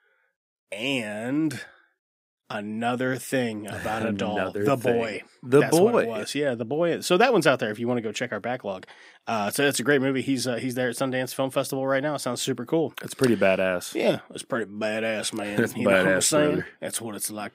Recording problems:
none

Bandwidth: 15.5 kHz